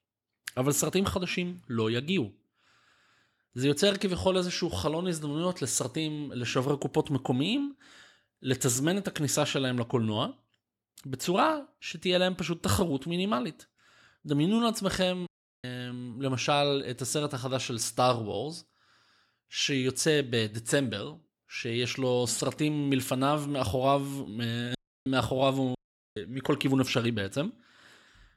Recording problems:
audio cutting out; at 15 s, at 25 s and at 26 s

